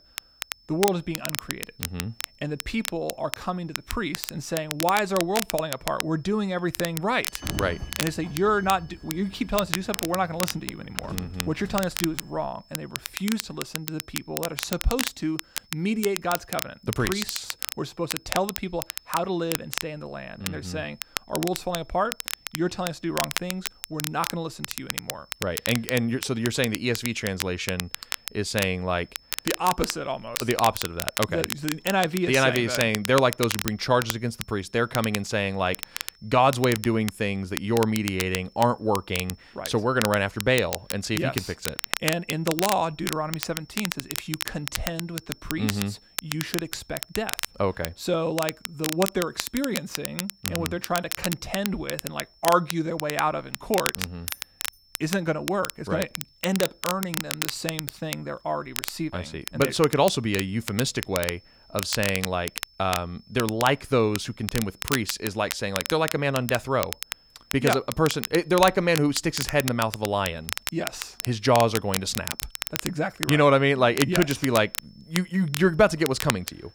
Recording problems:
crackle, like an old record; loud; 6 dB below the speech
high-pitched whine; faint; throughout; 5.5 kHz, 30 dB below the speech
door banging; noticeable; from 7.5 to 12 s; peak 6 dB below the speech
jangling keys; faint; at 54 s; peak 15 dB below the speech

